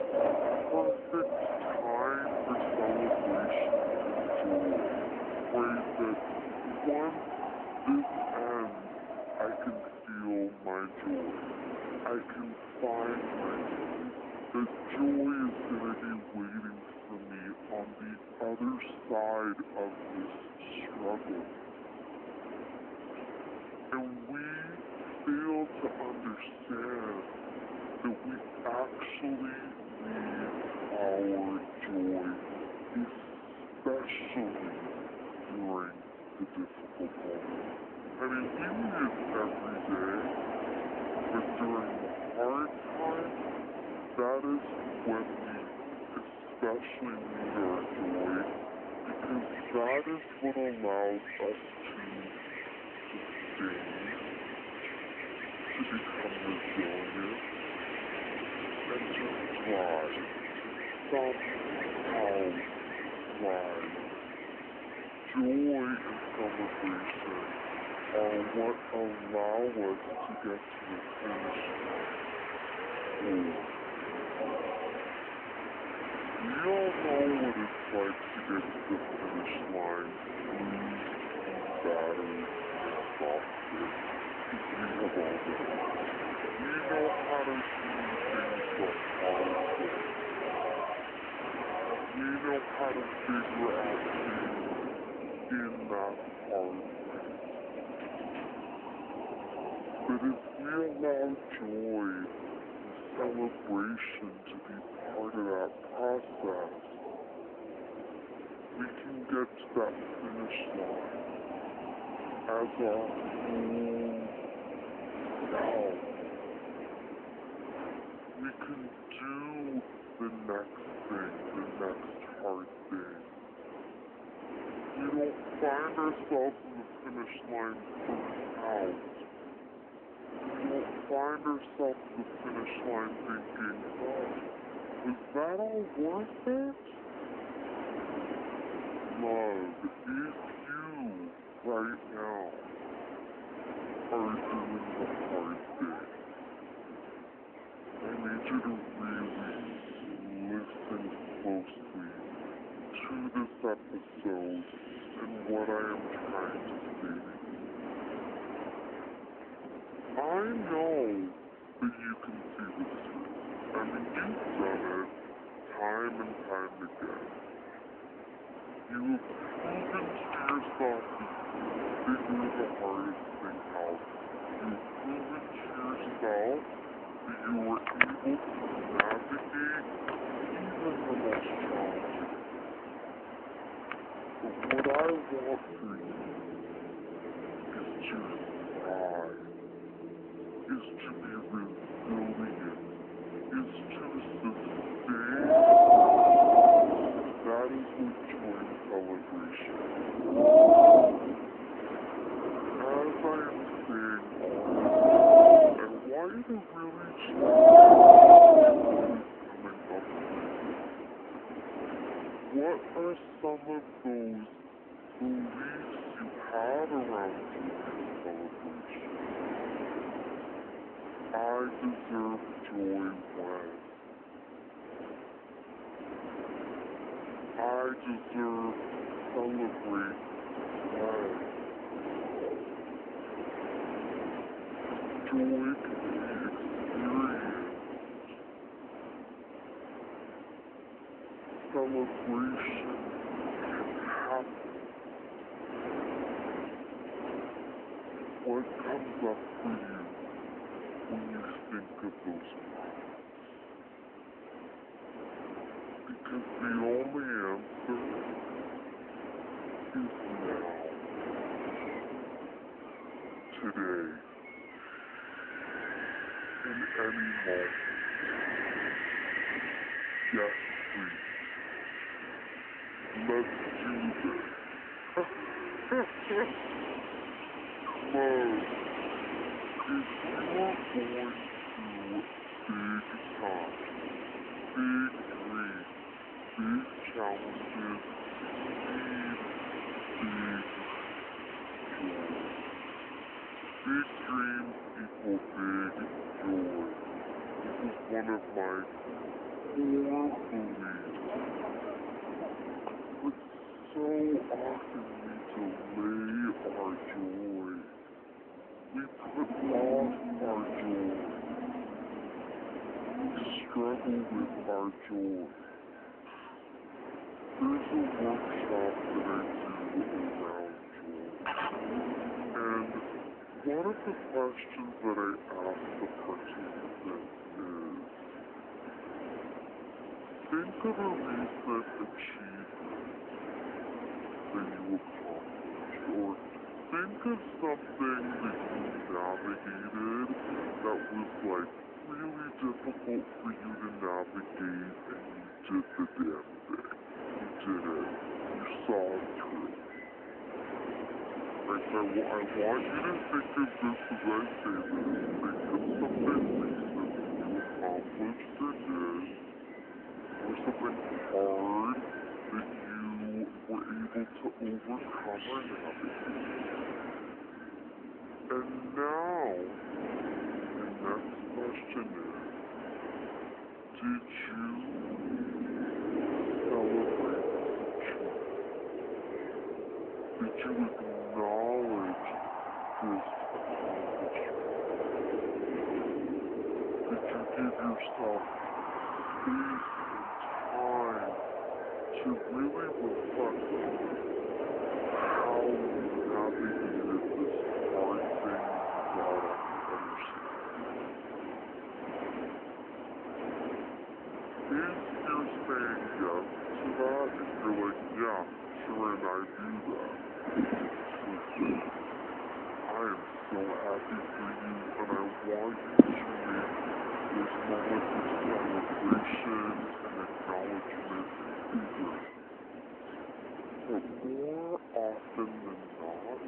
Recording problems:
wrong speed and pitch; too slow and too low; 0.6 times normal speed
echo of what is said; noticeable; from 5:15 on; 420 ms later, 15 dB below the speech
phone-call audio
wind in the background; very loud; throughout; 5 dB above the speech
animal sounds; faint; throughout; 20 dB below the speech

